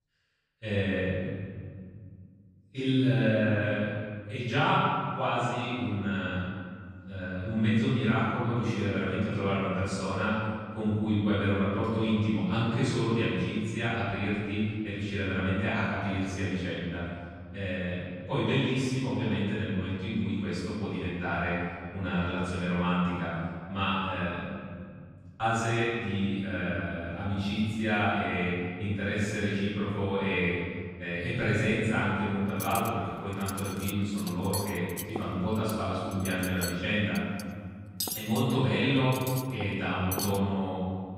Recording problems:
room echo; strong; dies away in 1.9 s
off-mic speech; far
clattering dishes; noticeable; from 33 to 40 s; peak 3 dB below the speech

